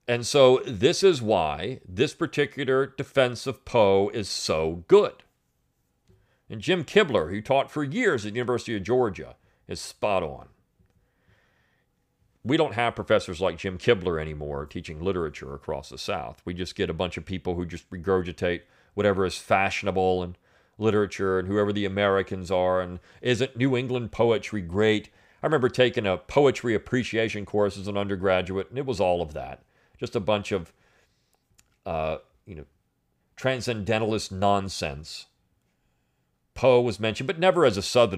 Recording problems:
abrupt cut into speech; at the end

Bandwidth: 15 kHz